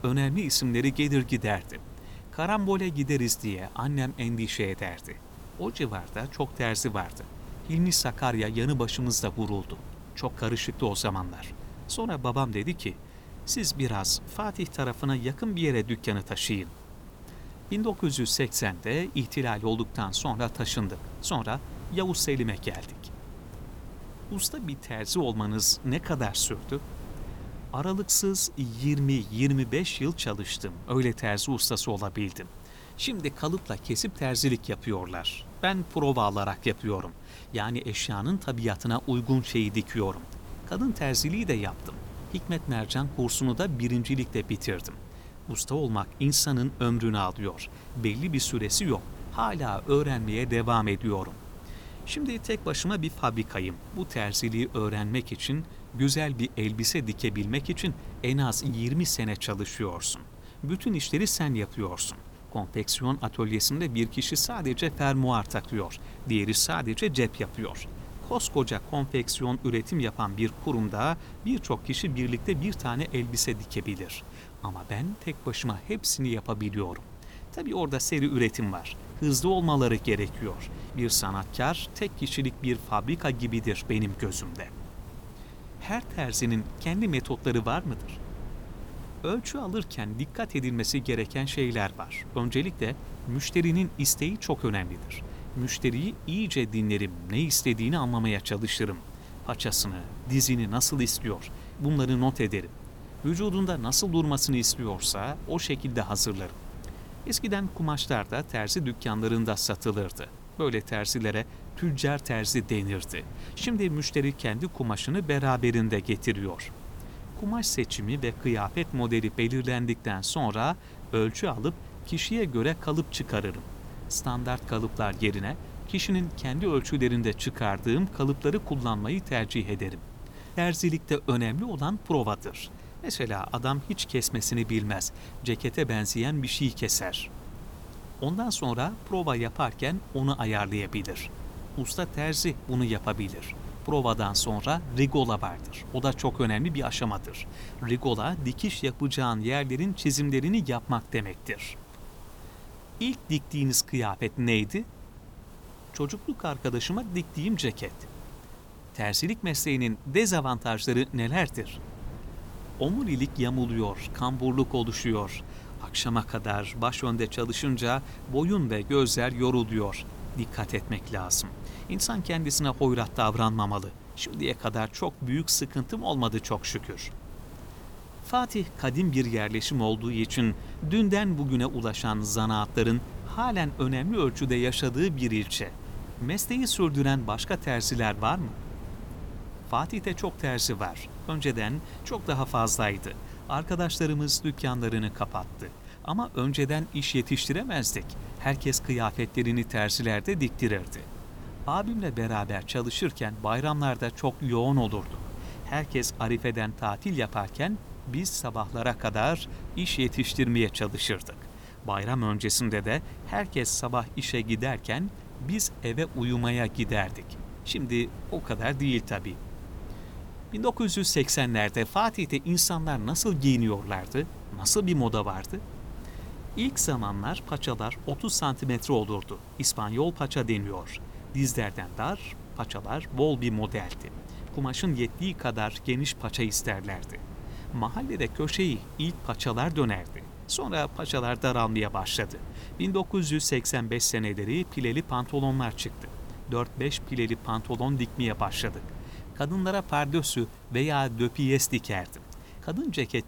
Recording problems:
wind noise on the microphone; occasional gusts; 20 dB below the speech
hiss; faint; throughout; 25 dB below the speech

